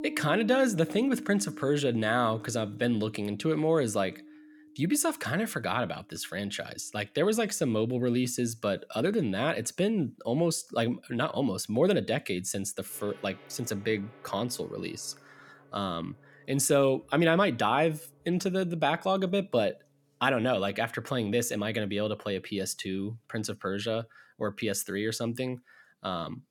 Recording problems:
background music; noticeable; throughout; 20 dB below the speech

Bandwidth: 18 kHz